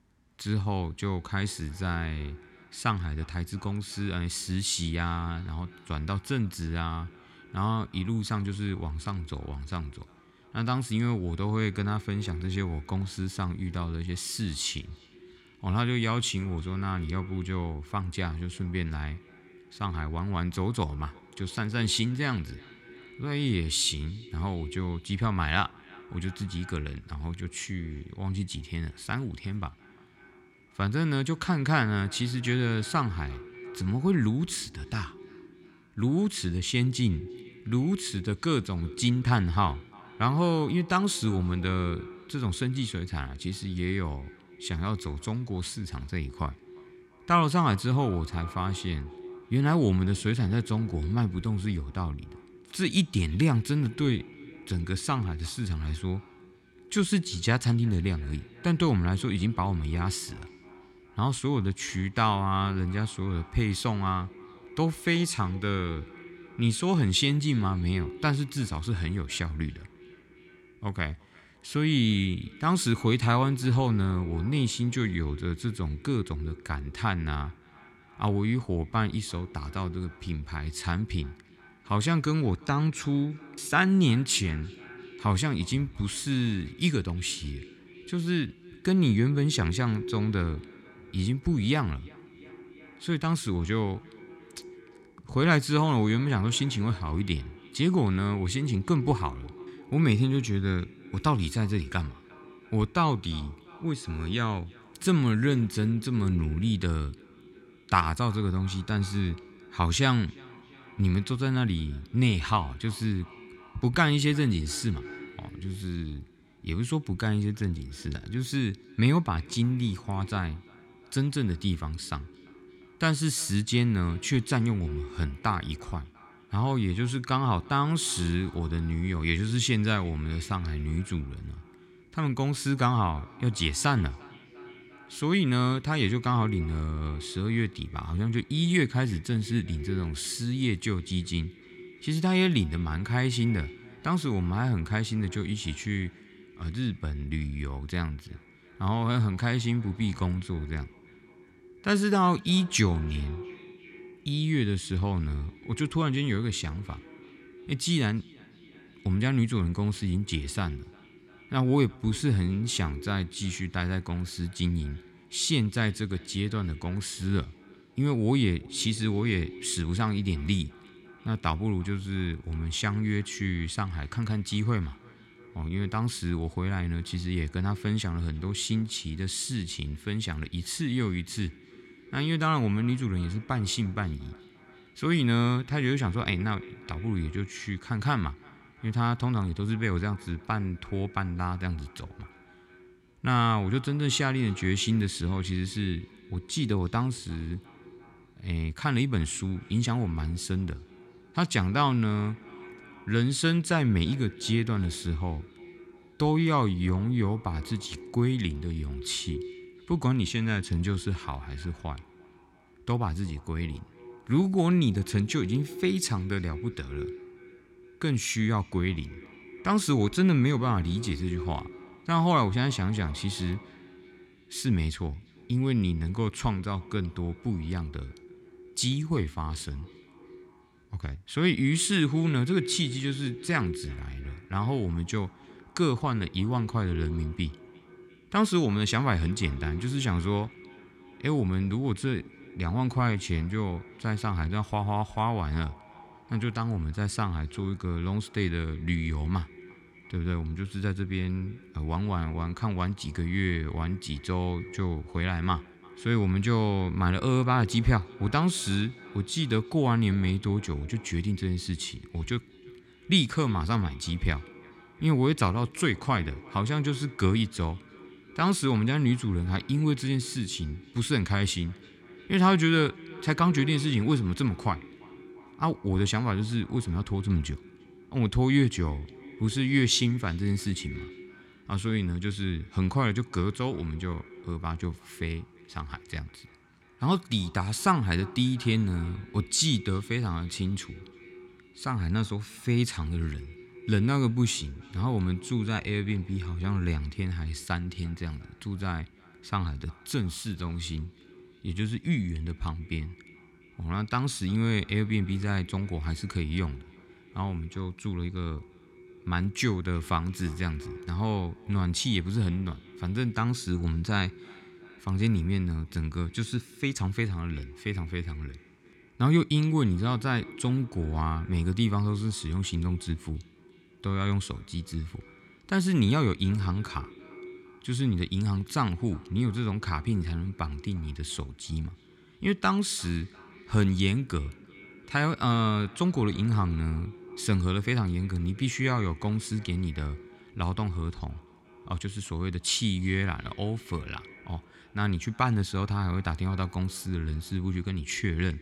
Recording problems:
echo of what is said; faint; throughout; 350 ms later, 20 dB below the speech

